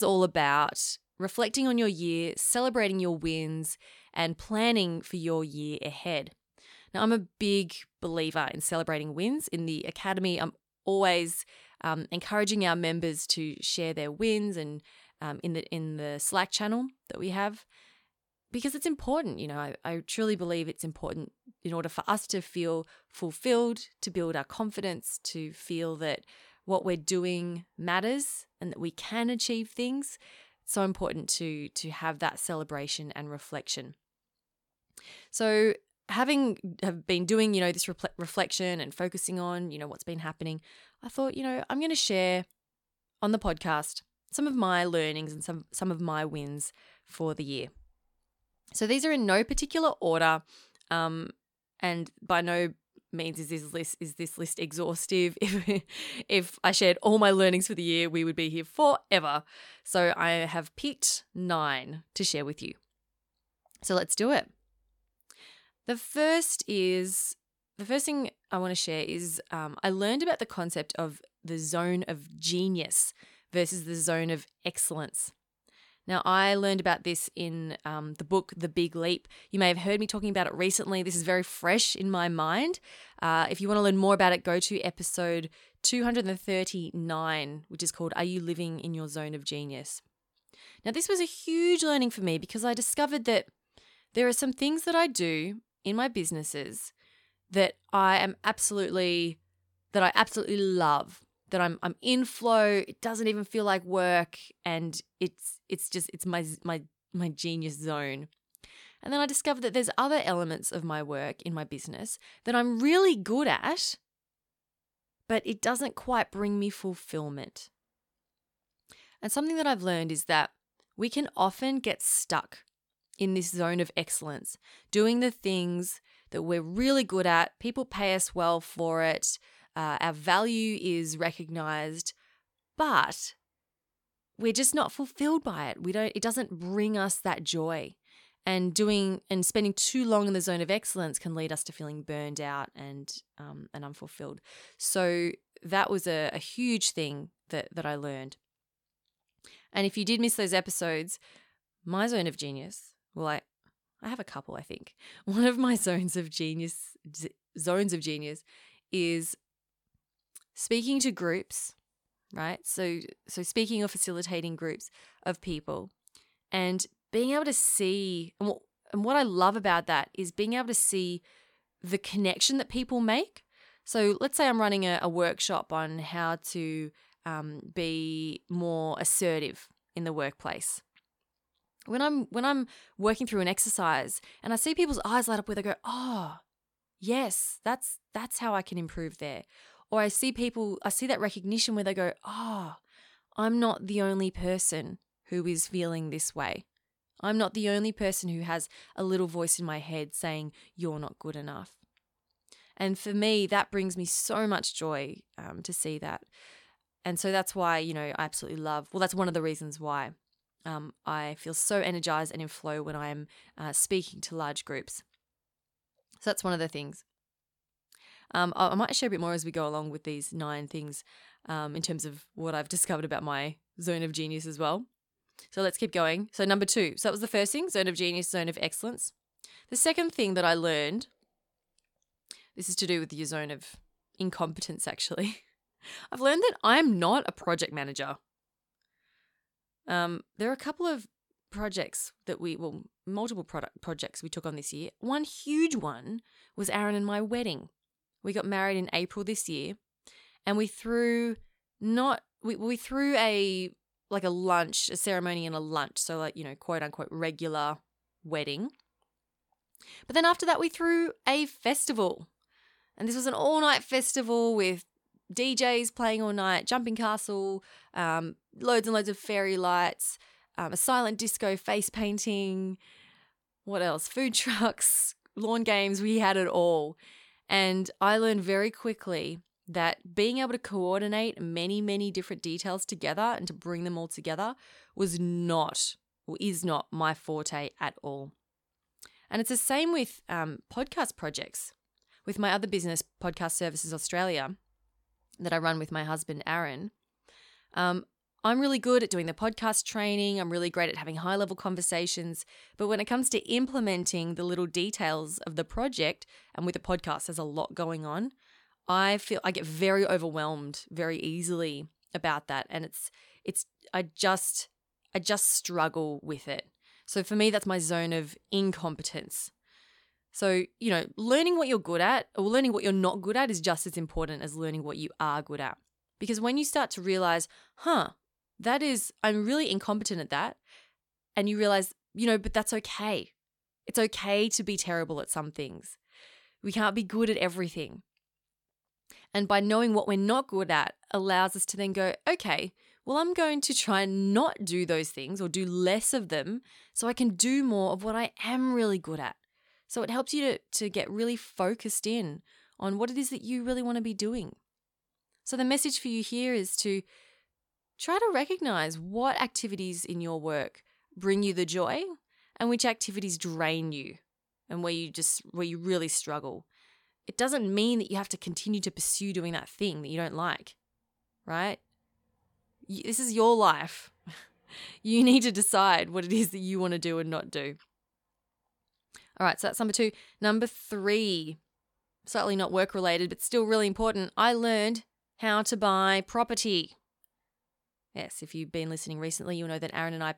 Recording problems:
abrupt cut into speech; at the start

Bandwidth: 17 kHz